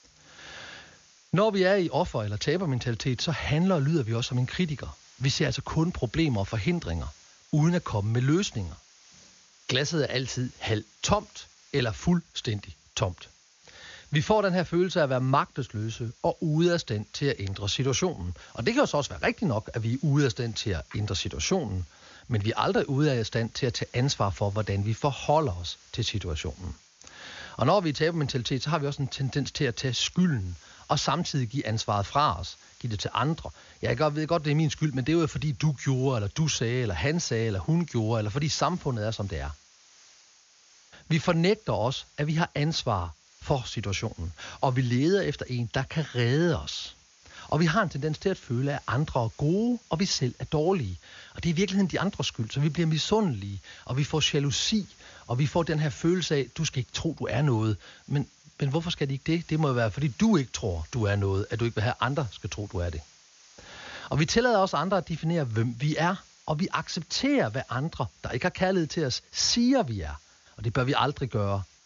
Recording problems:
high frequencies cut off; noticeable; nothing above 7 kHz
hiss; faint; throughout; 25 dB below the speech

